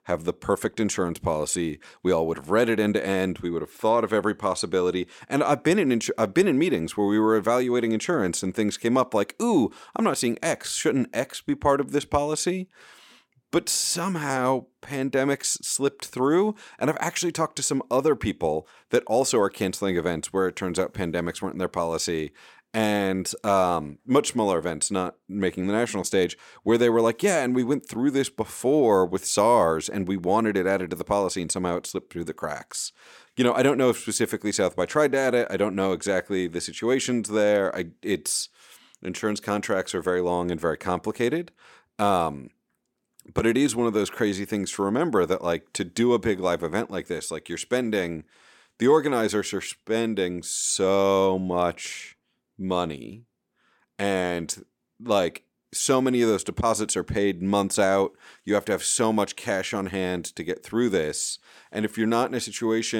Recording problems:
abrupt cut into speech; at the end

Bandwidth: 17 kHz